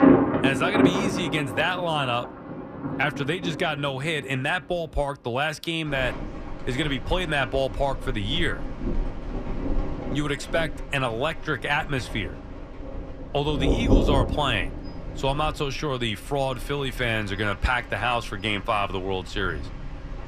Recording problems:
rain or running water; loud; throughout; 3 dB below the speech

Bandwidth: 14.5 kHz